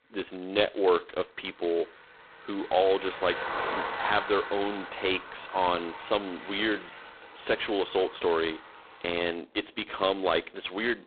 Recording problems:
phone-call audio; poor line; nothing above 3.5 kHz
traffic noise; loud; throughout; 9 dB below the speech

